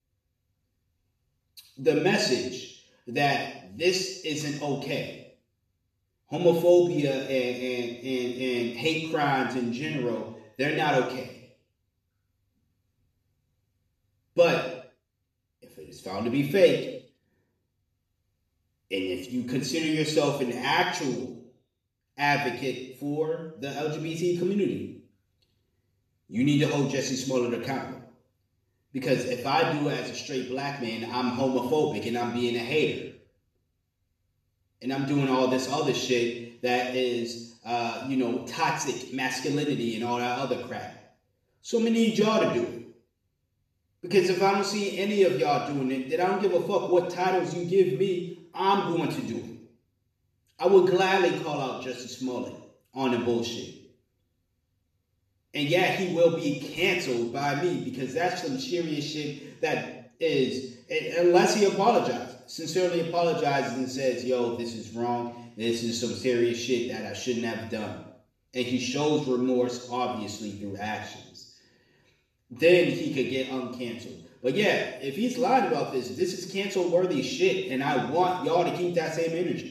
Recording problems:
off-mic speech; far
room echo; noticeable; dies away in 0.7 s

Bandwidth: 13.5 kHz